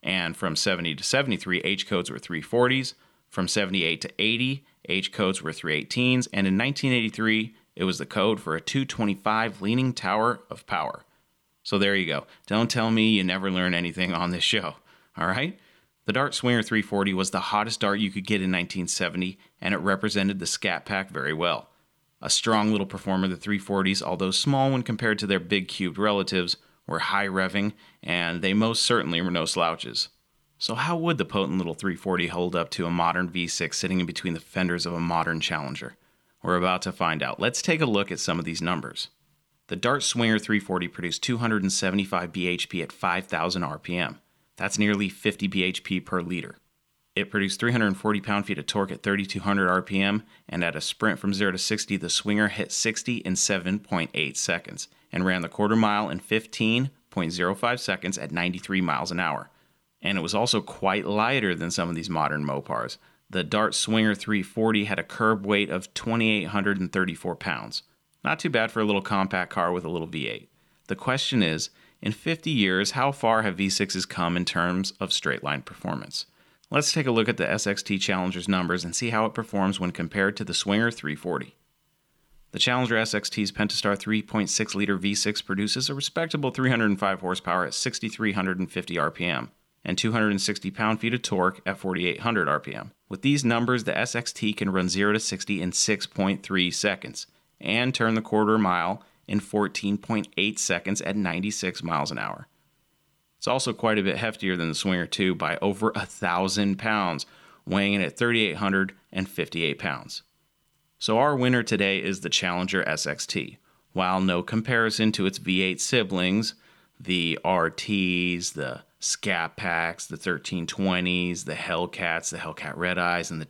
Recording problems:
none

